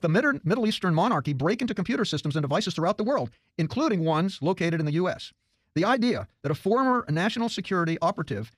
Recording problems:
wrong speed, natural pitch; too fast; 1.6 times normal speed

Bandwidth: 15 kHz